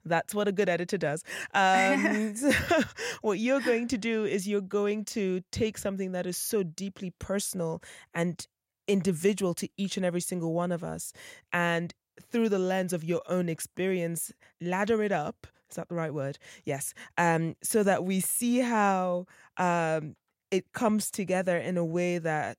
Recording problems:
none

